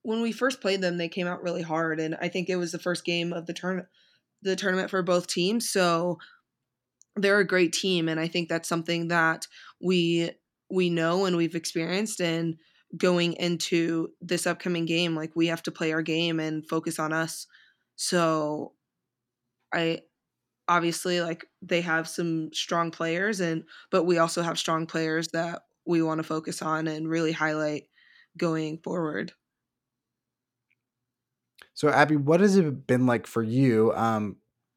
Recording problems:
none

